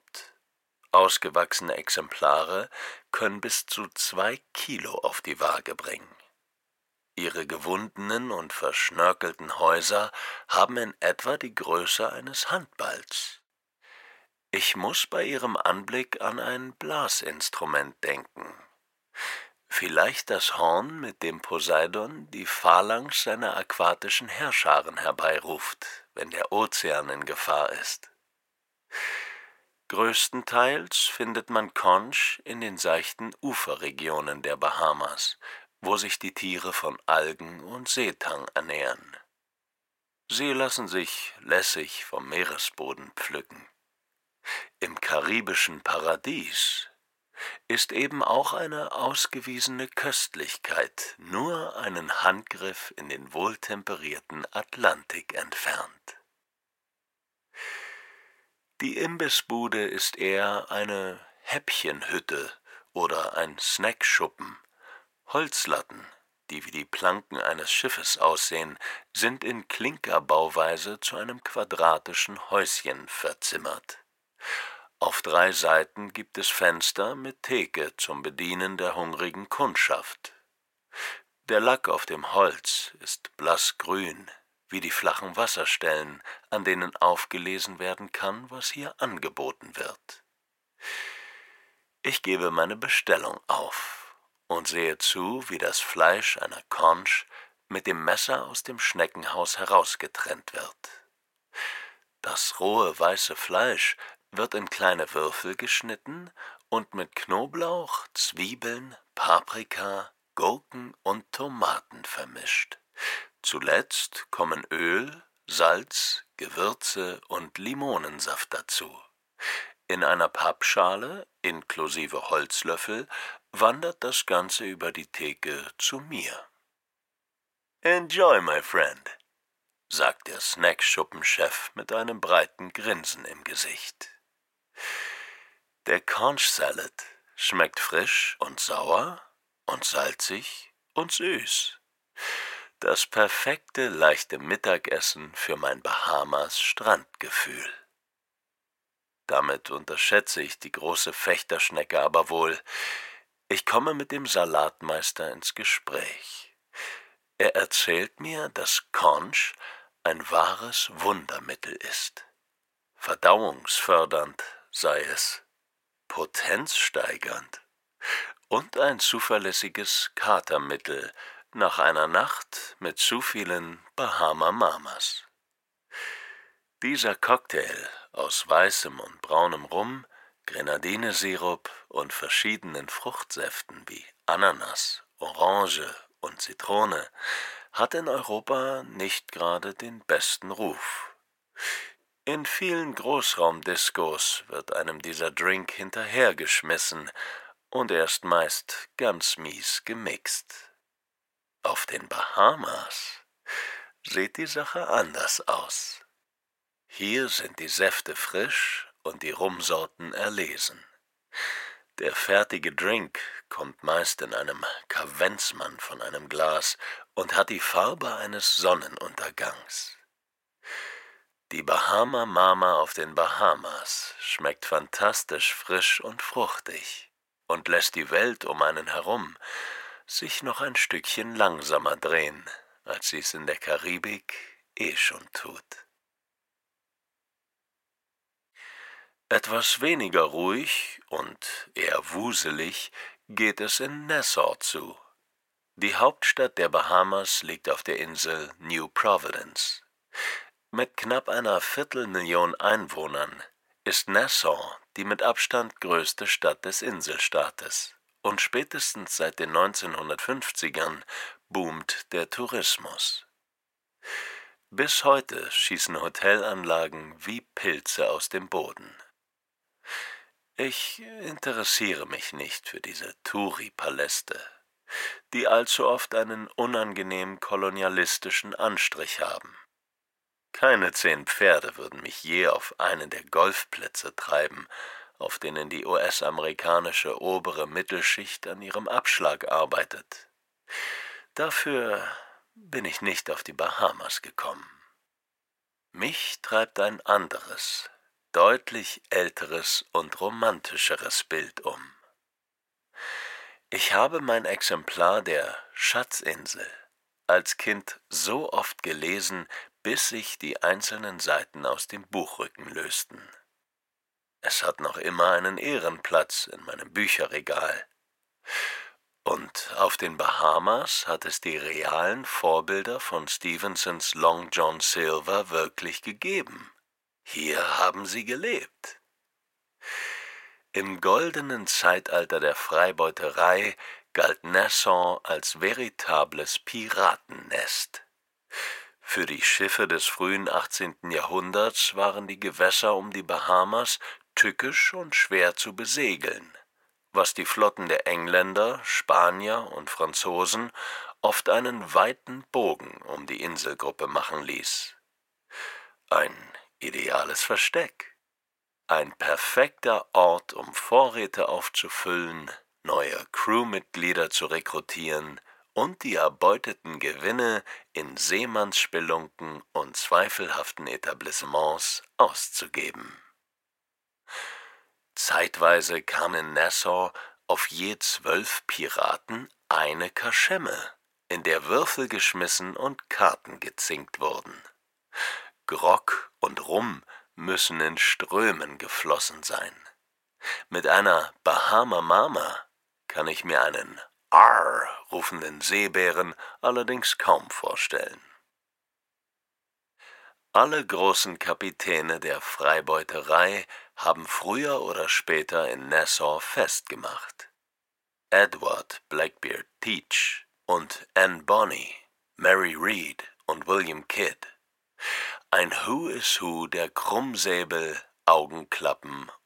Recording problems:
thin; very; fading below 600 Hz

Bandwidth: 16.5 kHz